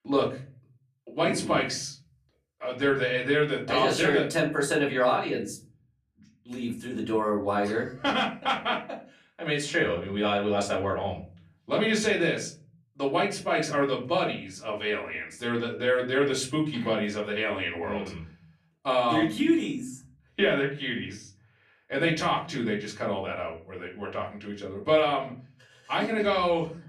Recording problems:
off-mic speech; far
room echo; slight; dies away in 0.4 s

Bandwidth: 14.5 kHz